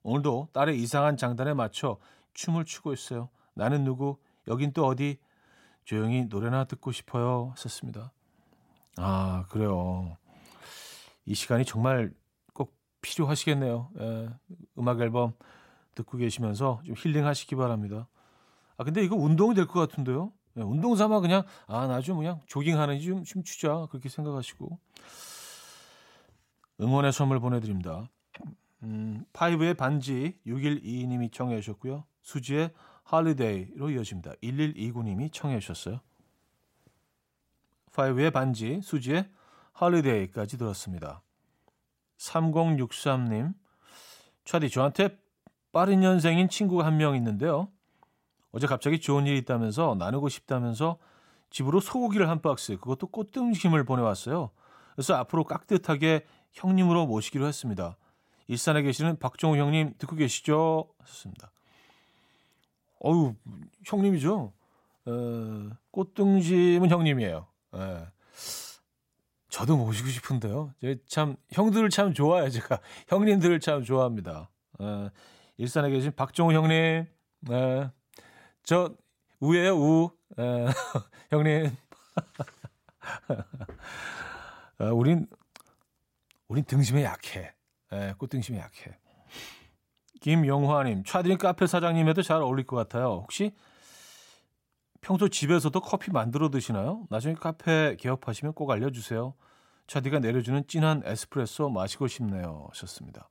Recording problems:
none

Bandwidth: 16 kHz